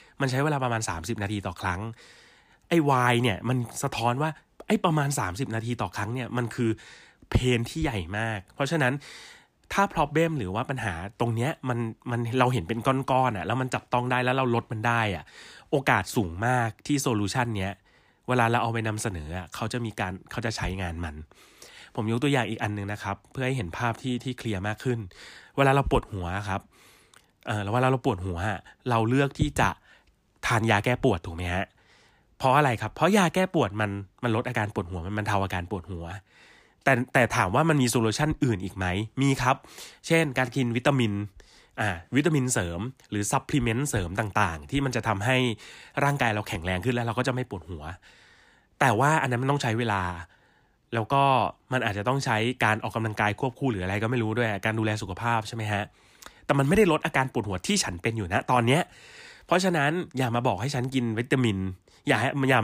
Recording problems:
abrupt cut into speech; at the end

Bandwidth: 15 kHz